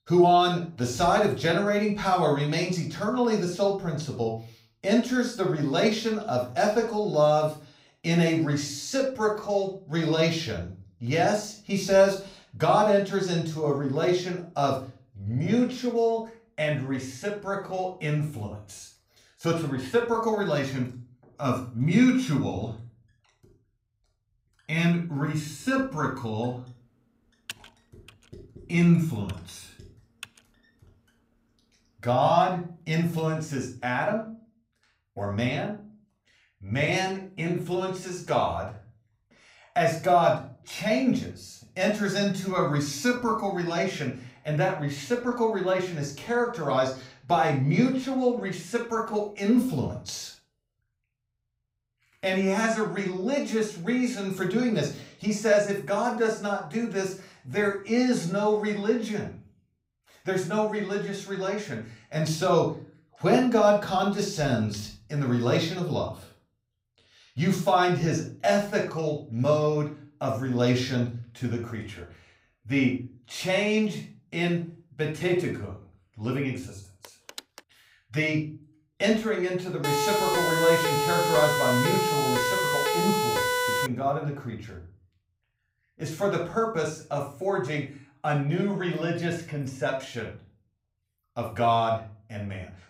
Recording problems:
off-mic speech; far
room echo; slight; dies away in 0.4 s
keyboard typing; faint; from 27 to 30 s; peak 15 dB below the speech
phone ringing; faint; at 1:17; peak 15 dB below the speech
siren; loud; from 1:20 to 1:24; peak 2 dB above the speech

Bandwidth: 15.5 kHz